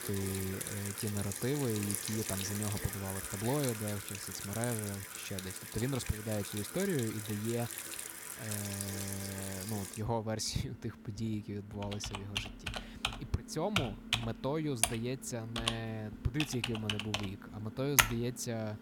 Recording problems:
household noises; very loud; throughout; as loud as the speech

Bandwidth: 17 kHz